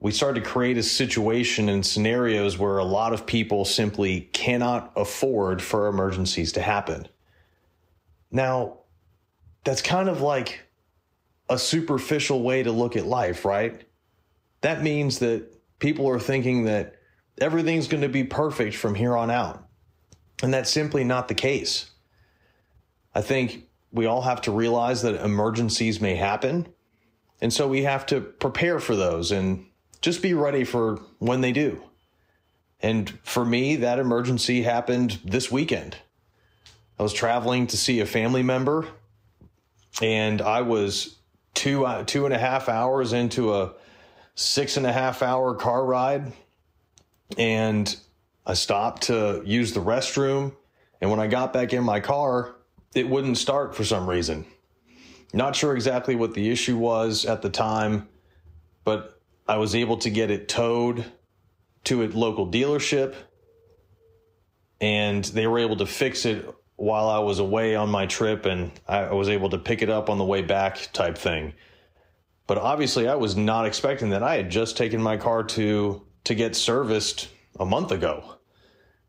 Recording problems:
squashed, flat; somewhat

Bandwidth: 15.5 kHz